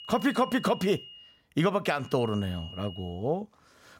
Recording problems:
high-pitched whine; noticeable; until 1 s and from 2 to 3 s; 3 kHz, 15 dB below the speech

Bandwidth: 16 kHz